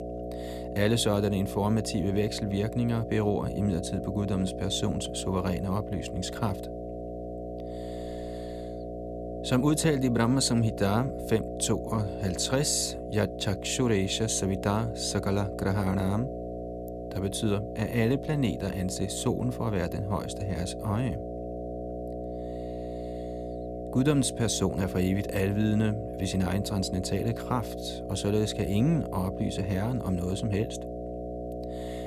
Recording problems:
electrical hum; loud; throughout; 60 Hz, 6 dB below the speech

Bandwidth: 14.5 kHz